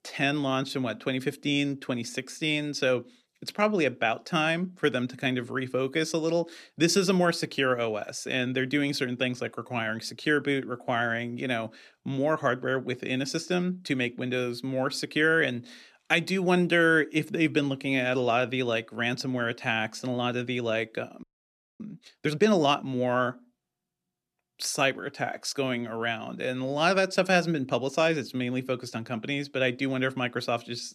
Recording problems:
audio freezing; at 21 s for 0.5 s

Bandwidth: 14 kHz